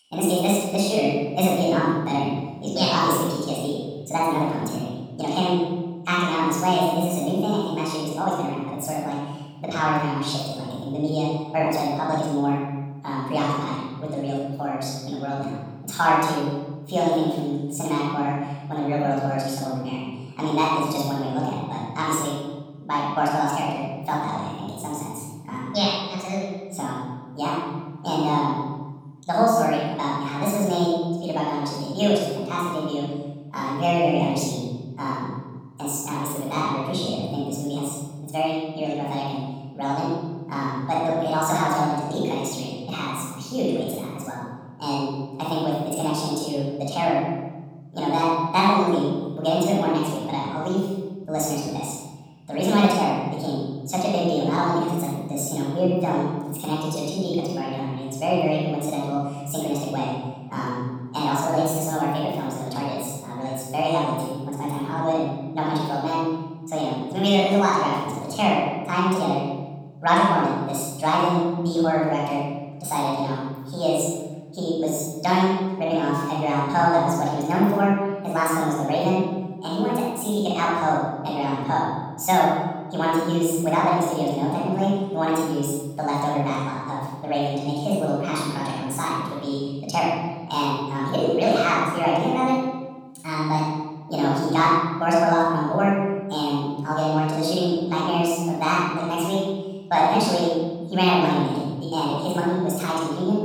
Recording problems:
room echo; strong; dies away in 1.5 s
off-mic speech; far
wrong speed and pitch; too fast and too high; 1.6 times normal speed

